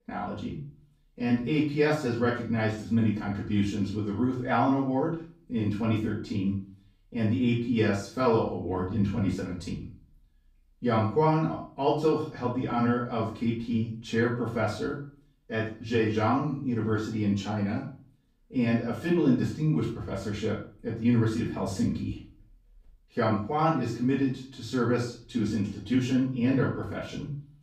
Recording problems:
off-mic speech; far
room echo; noticeable; dies away in 0.4 s

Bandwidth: 15.5 kHz